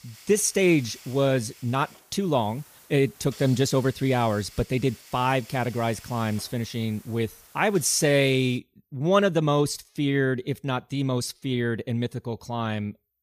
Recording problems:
hiss; faint; until 8.5 s; 20 dB below the speech

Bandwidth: 15 kHz